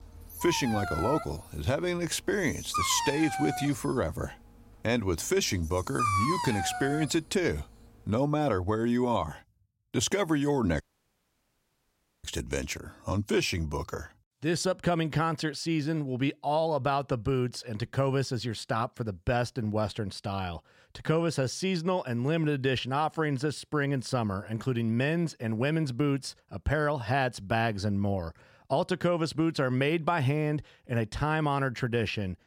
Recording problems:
dog barking; loud; until 7 s; peak 2 dB above the speech
audio cutting out; at 11 s for 1.5 s

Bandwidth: 16 kHz